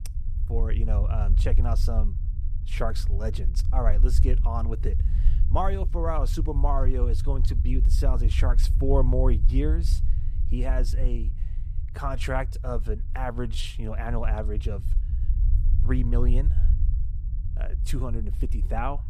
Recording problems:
low rumble; noticeable; throughout; 15 dB below the speech

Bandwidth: 14.5 kHz